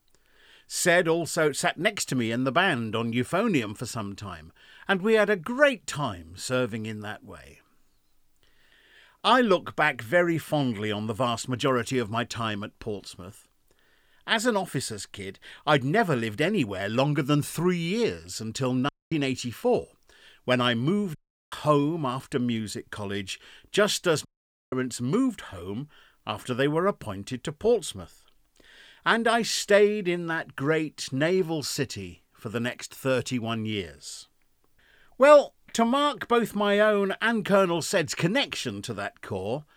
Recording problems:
audio cutting out; at 19 s, at 21 s and at 24 s

